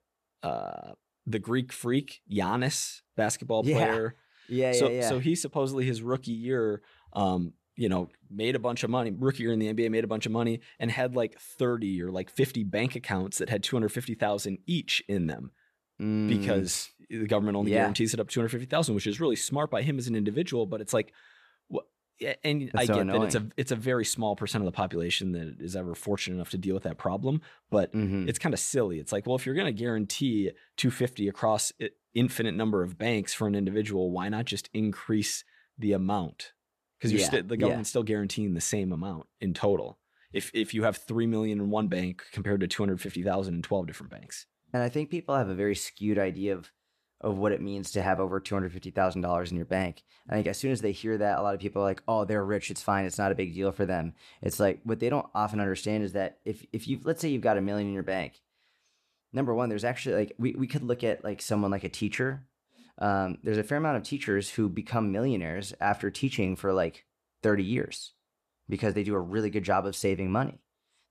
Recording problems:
none

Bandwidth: 14 kHz